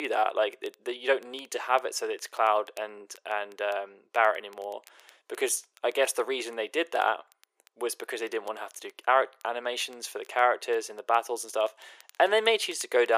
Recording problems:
thin; very; fading below 350 Hz
crackle, like an old record; faint; 30 dB below the speech
abrupt cut into speech; at the start and the end

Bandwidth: 15 kHz